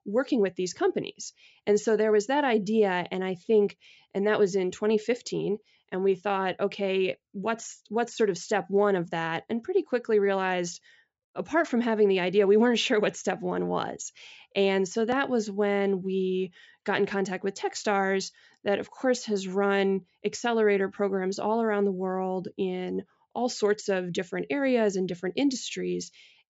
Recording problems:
high frequencies cut off; noticeable; nothing above 8 kHz

